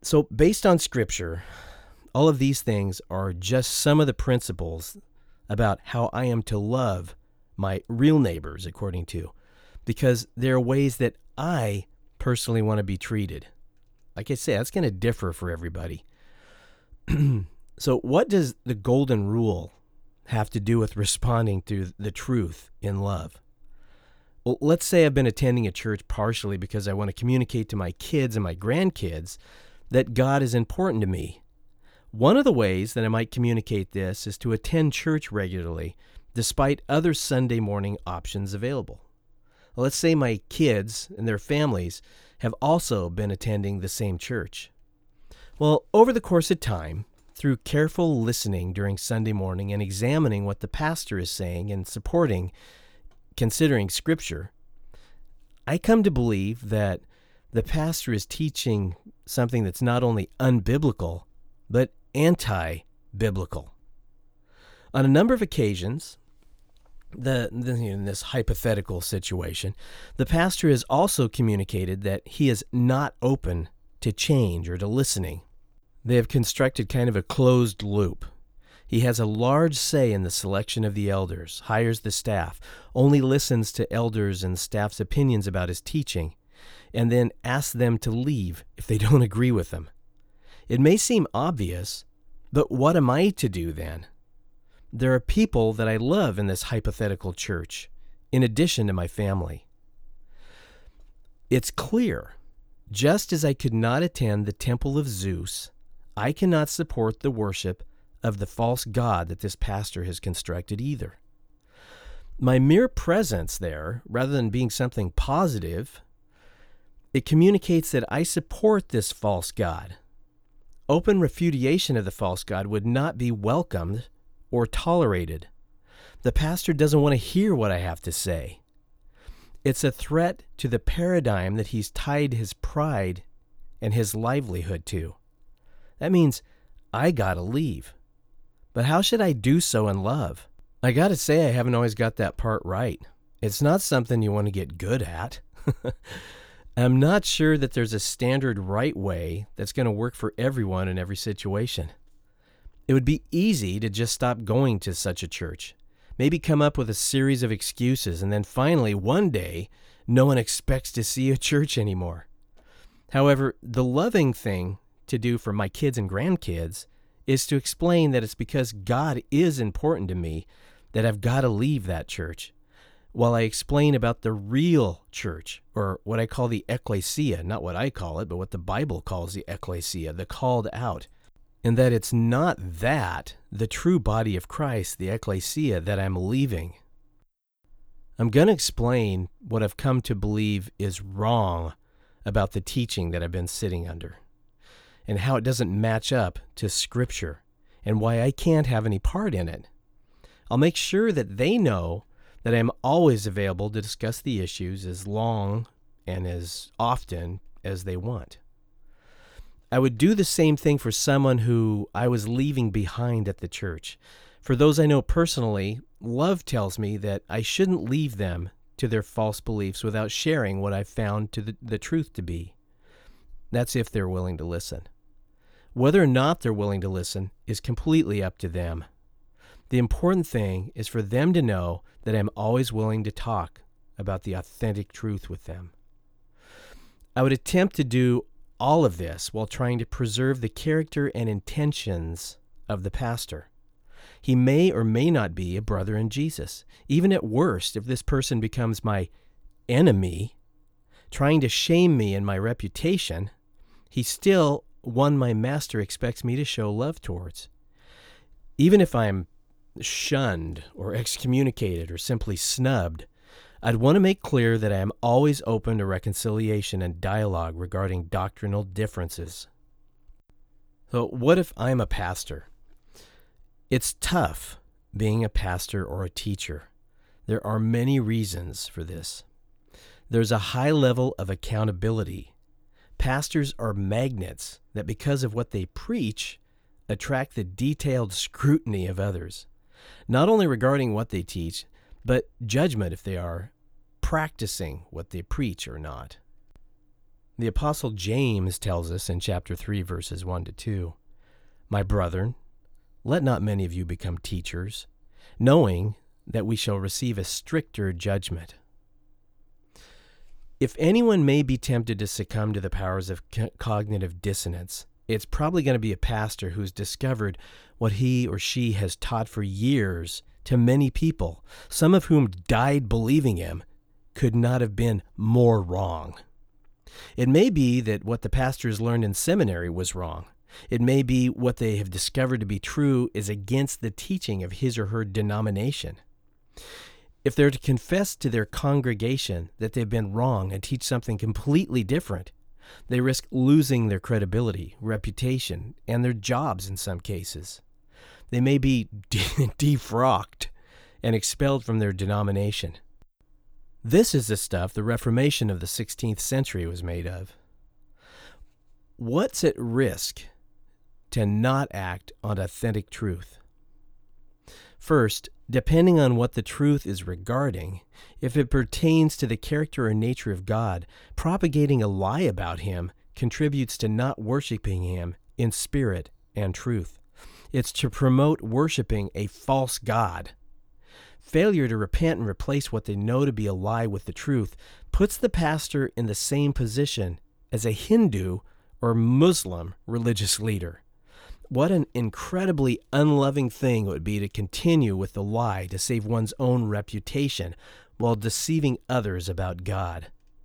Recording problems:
uneven, jittery; strongly; from 57 s to 6:38

